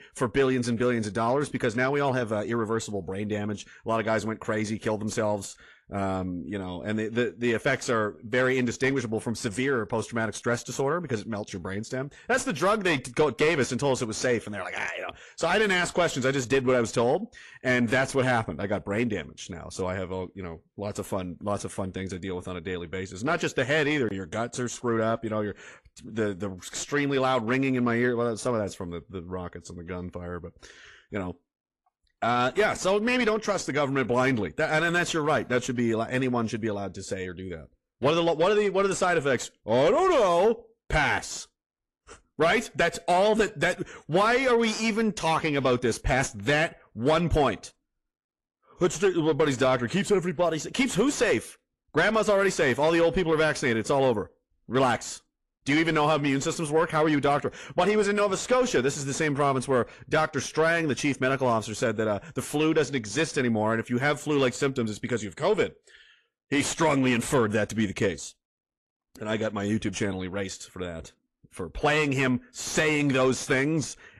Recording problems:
distortion; slight; 10 dB below the speech
garbled, watery; slightly; nothing above 11.5 kHz

